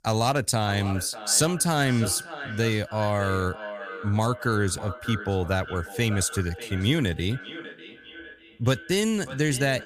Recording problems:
echo of what is said; noticeable; throughout; 600 ms later, 15 dB below the speech

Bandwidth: 15 kHz